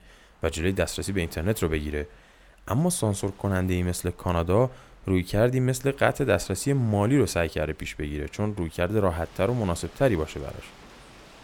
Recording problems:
rain or running water; faint; throughout; 25 dB below the speech

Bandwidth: 17.5 kHz